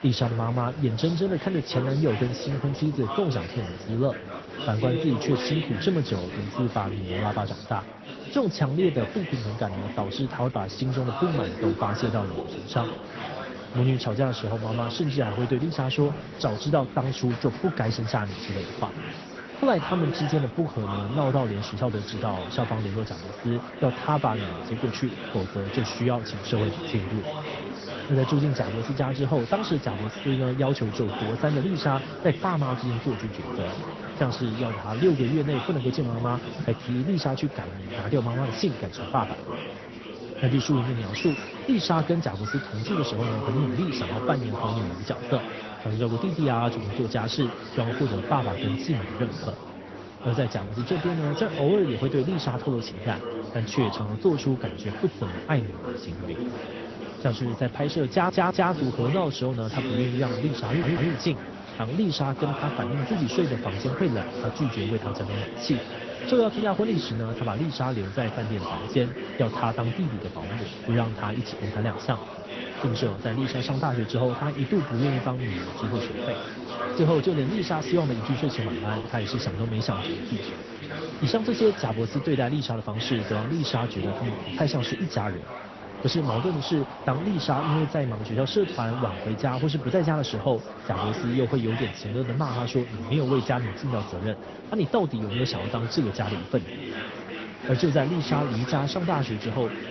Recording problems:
garbled, watery; slightly; nothing above 6 kHz
chatter from many people; loud; throughout; 8 dB below the speech
audio stuttering; at 58 s and at 1:01

